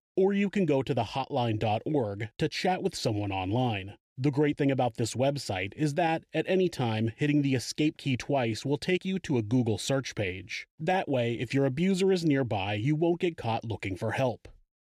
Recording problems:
none

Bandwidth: 14.5 kHz